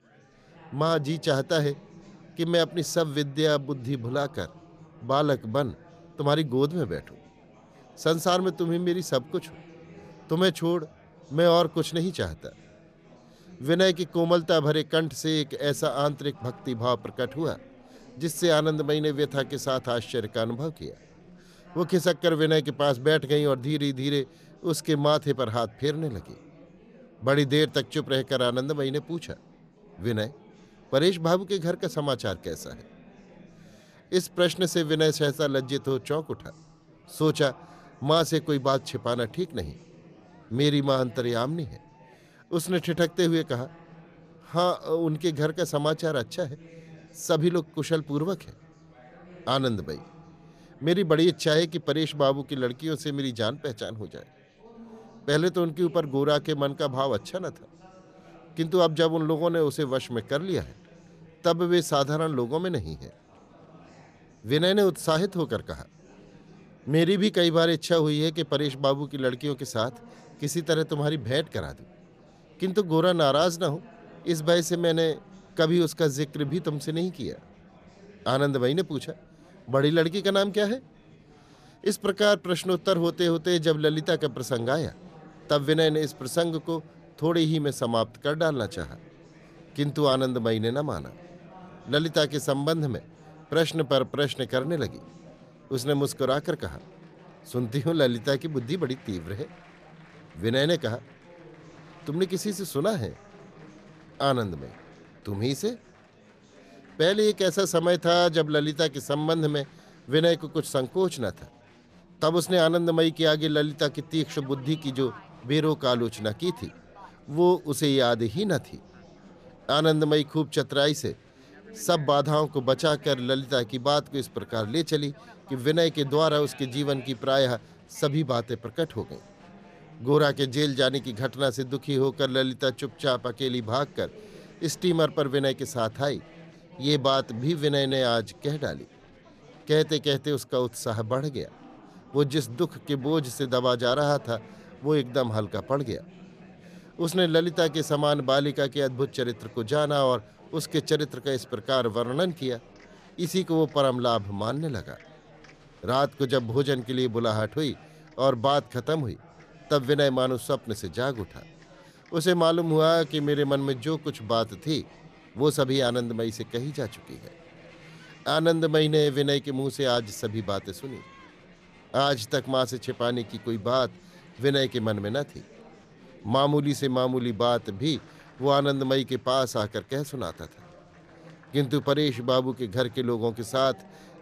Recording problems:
chatter from many people; faint; throughout; 25 dB below the speech

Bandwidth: 14.5 kHz